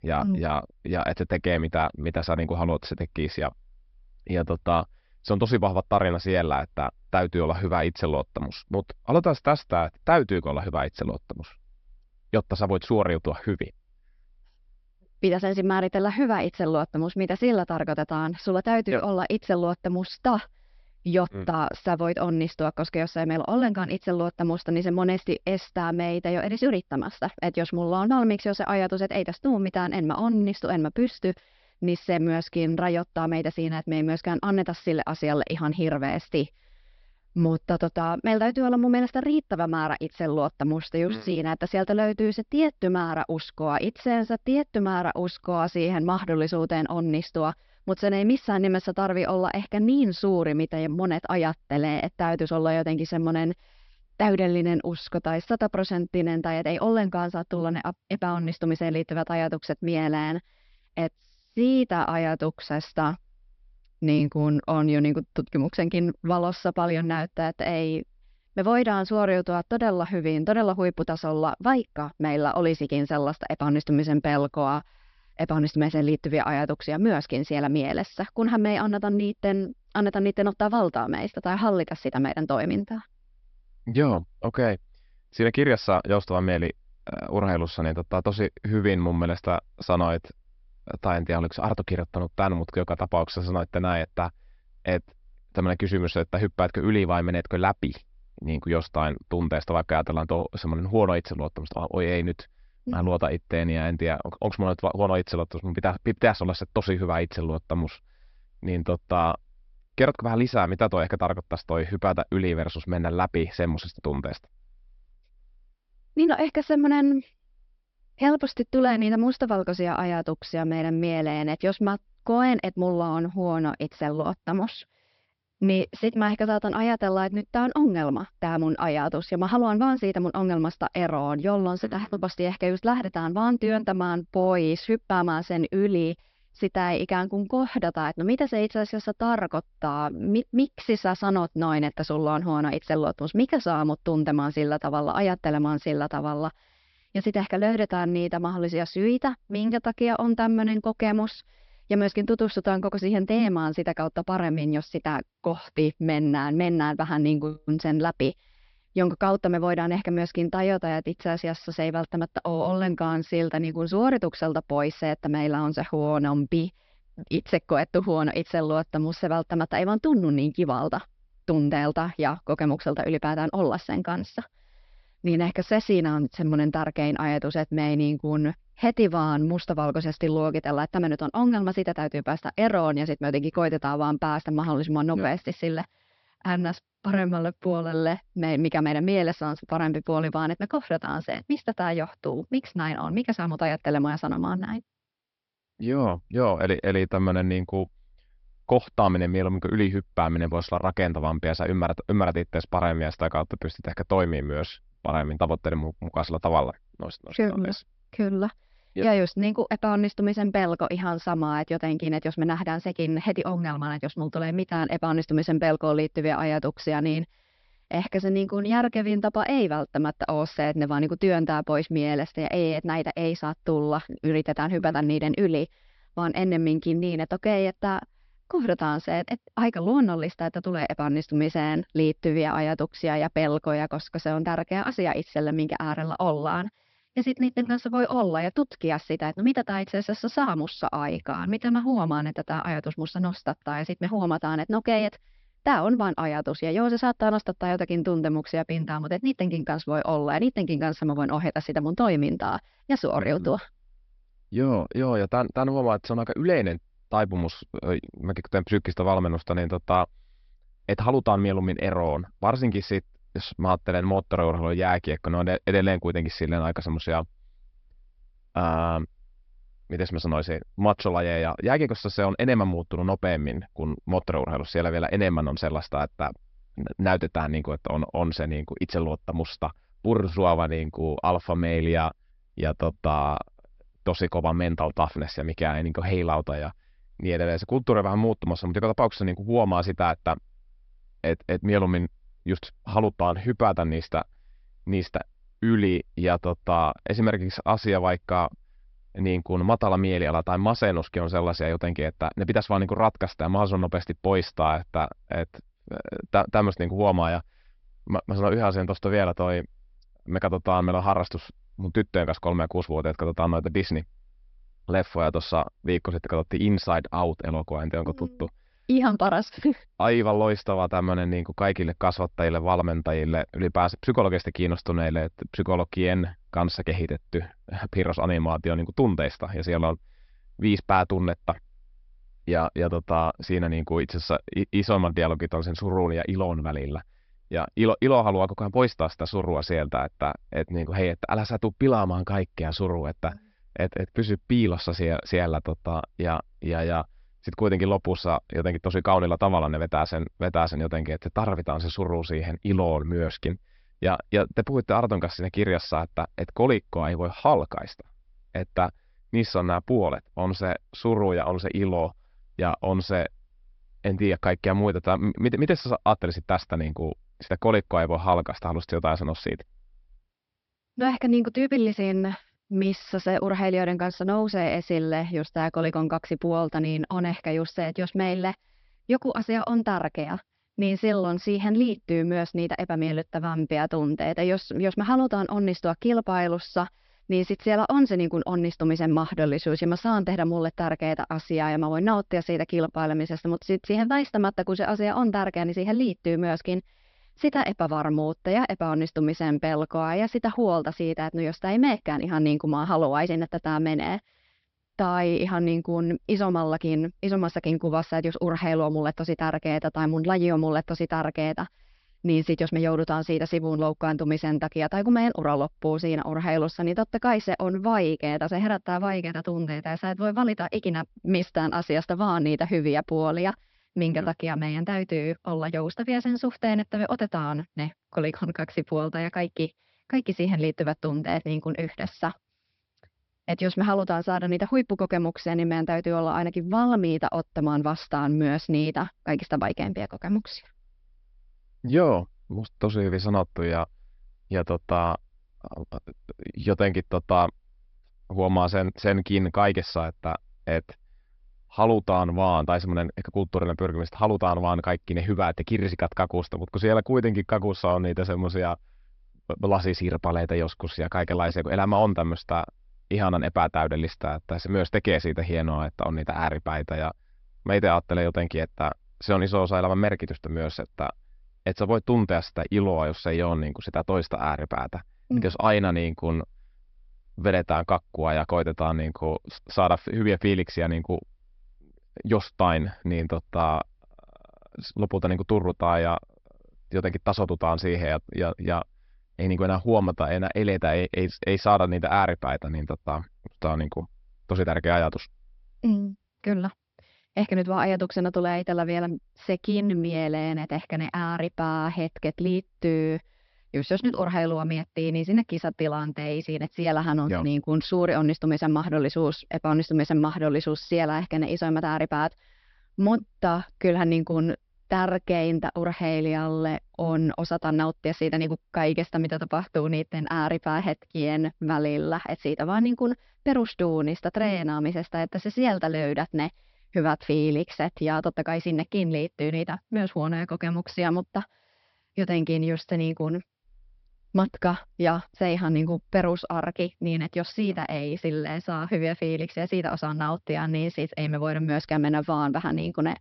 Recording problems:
high frequencies cut off; noticeable; nothing above 5.5 kHz

